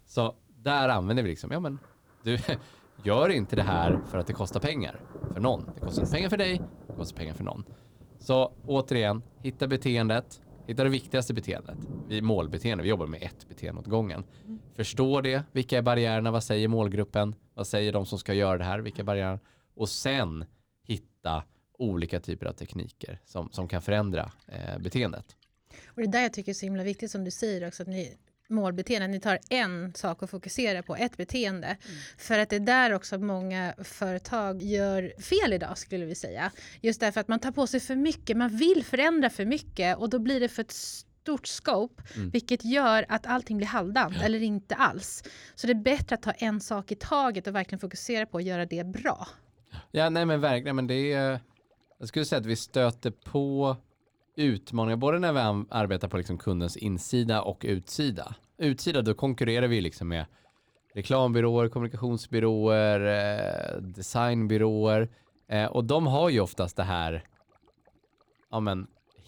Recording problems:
rain or running water; noticeable; throughout; 15 dB below the speech

